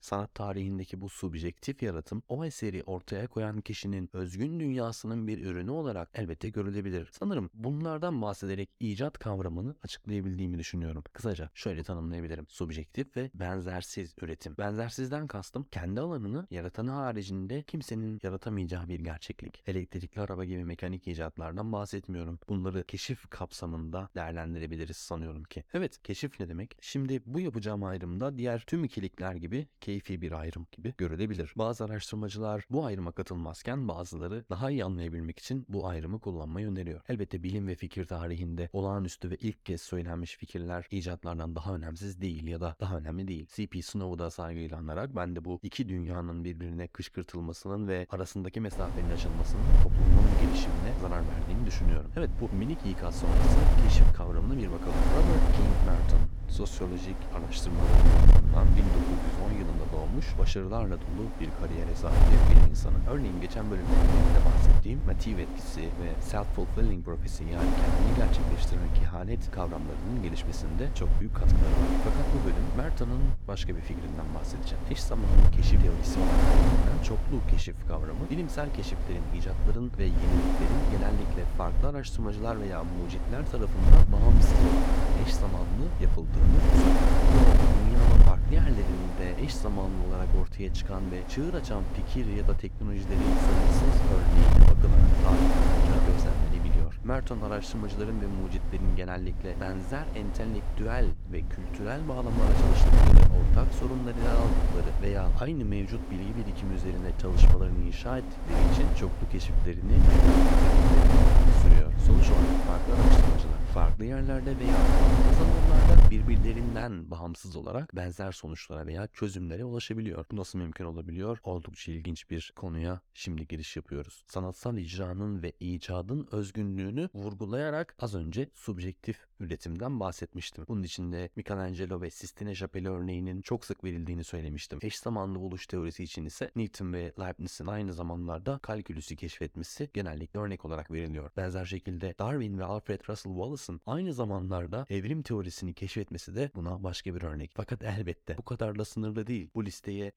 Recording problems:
wind noise on the microphone; heavy; from 49 s to 1:57; 3 dB above the speech

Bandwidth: 18 kHz